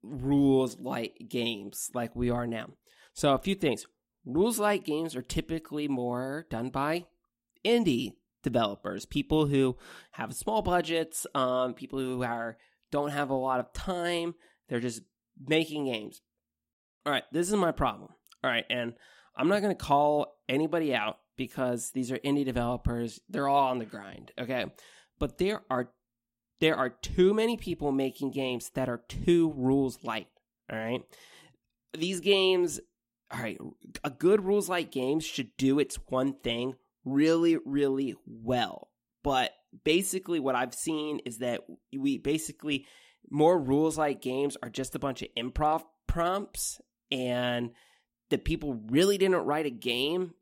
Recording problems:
none

